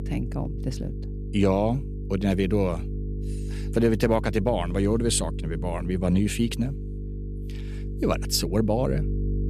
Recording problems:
electrical hum; noticeable; throughout; 50 Hz, 15 dB below the speech

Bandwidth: 14.5 kHz